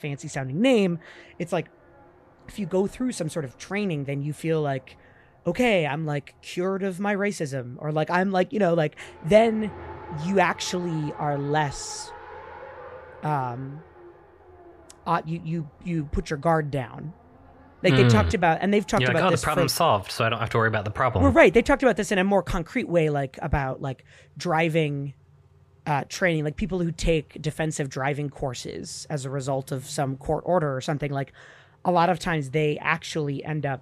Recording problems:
traffic noise; faint; throughout; 25 dB below the speech

